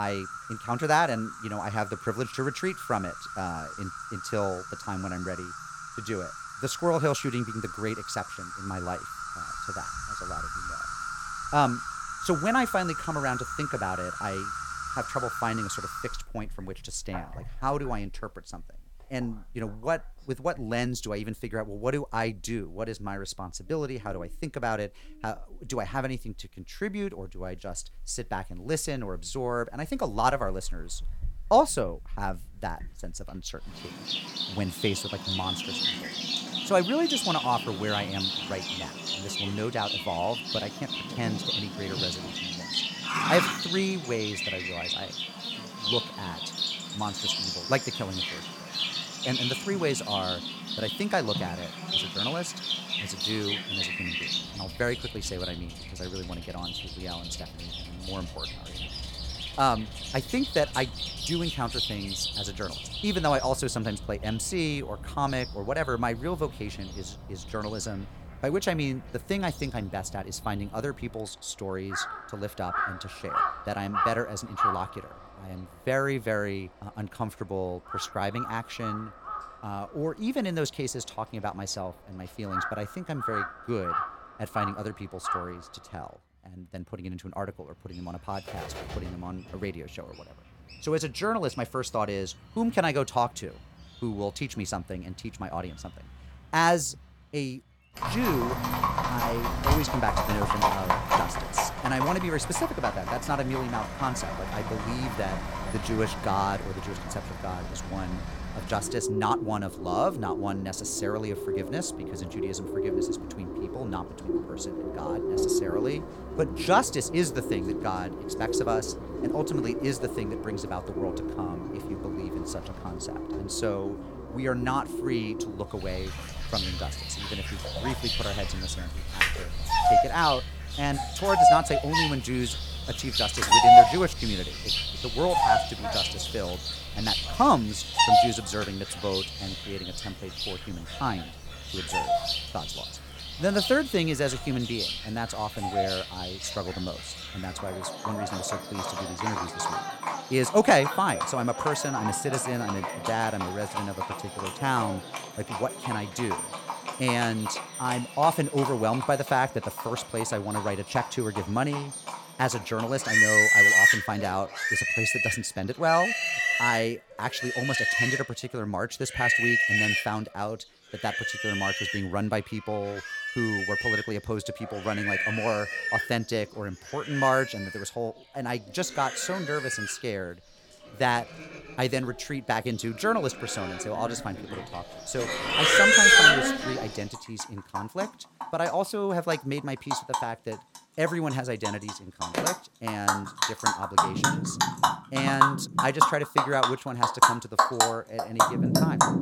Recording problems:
animal sounds; very loud; throughout; 3 dB above the speech
abrupt cut into speech; at the start

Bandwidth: 17 kHz